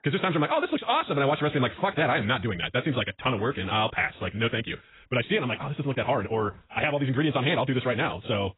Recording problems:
garbled, watery; badly; nothing above 4 kHz
wrong speed, natural pitch; too fast; 1.6 times normal speed

